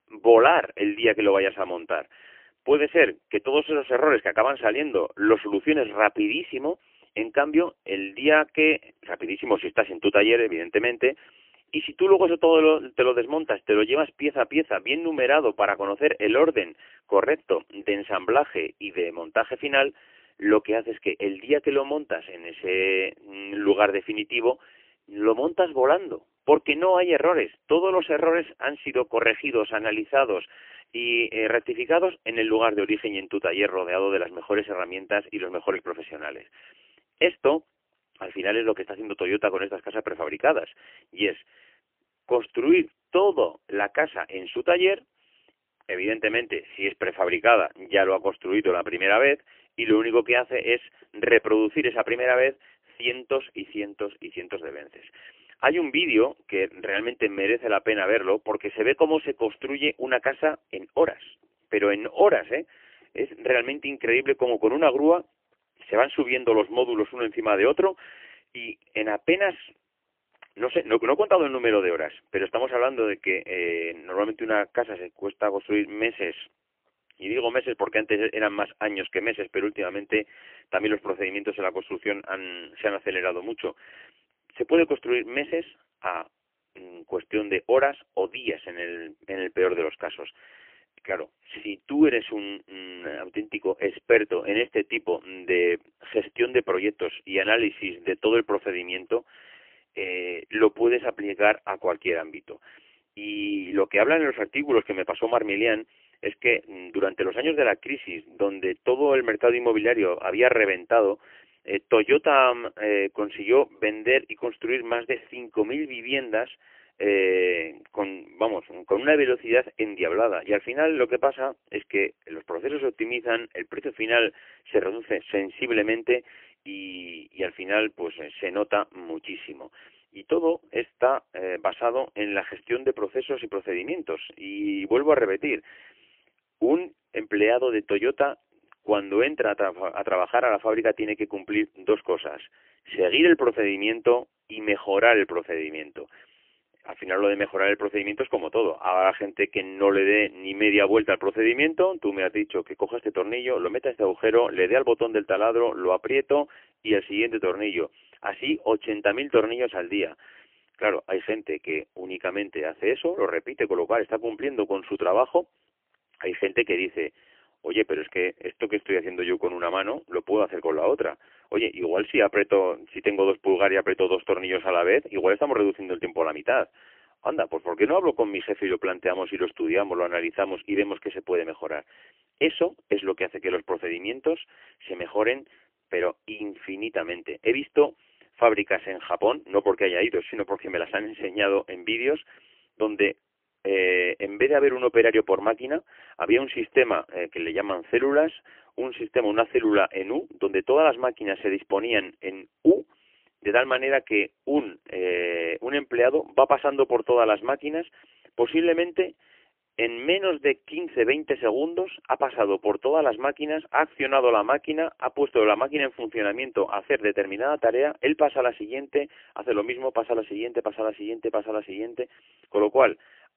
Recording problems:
phone-call audio; poor line; nothing above 3 kHz

